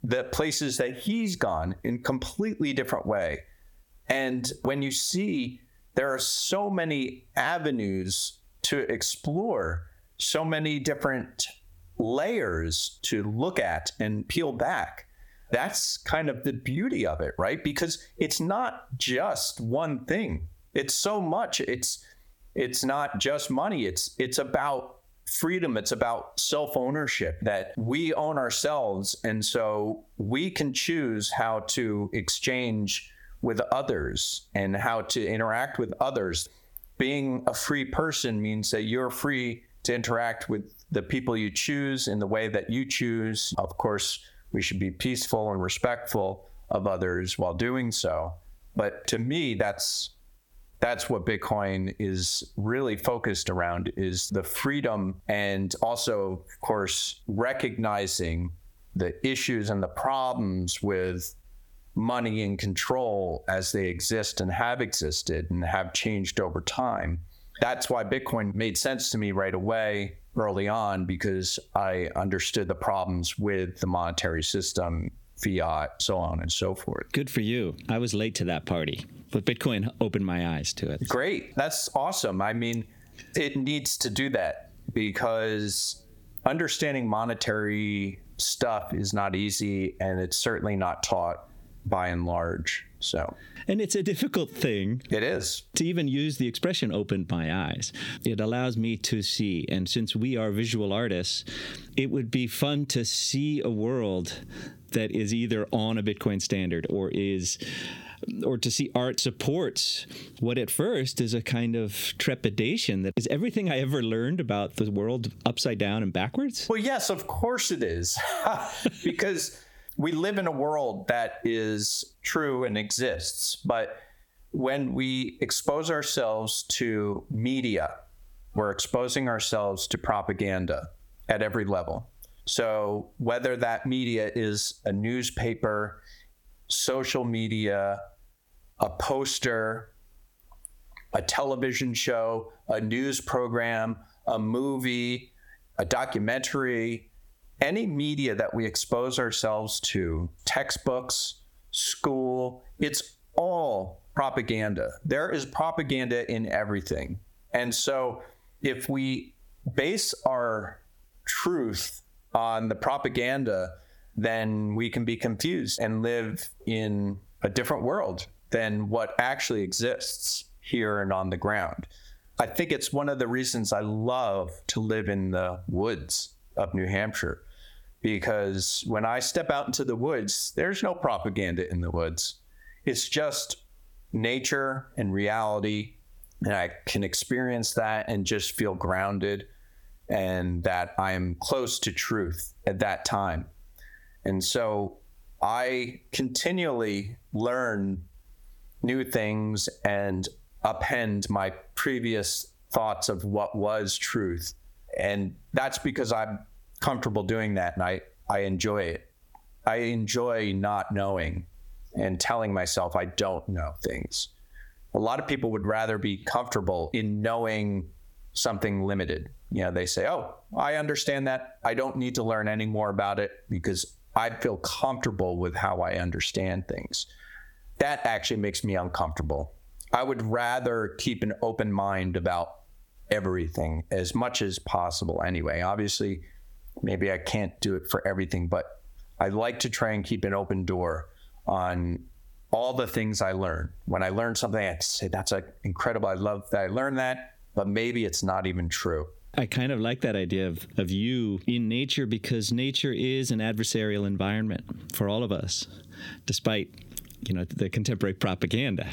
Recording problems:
squashed, flat; heavily

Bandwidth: 18 kHz